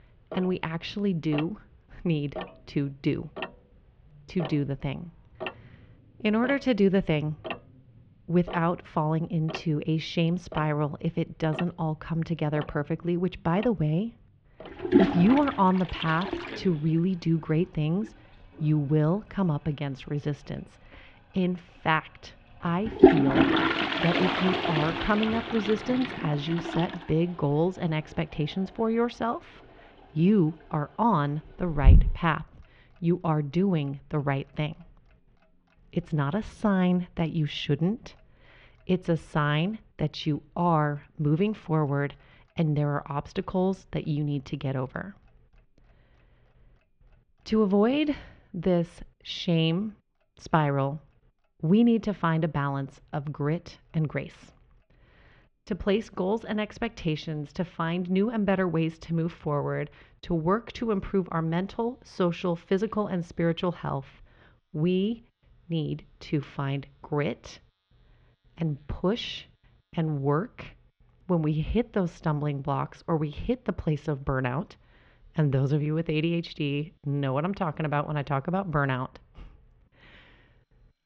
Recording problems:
muffled; very; fading above 3.5 kHz
household noises; loud; throughout; 1 dB below the speech

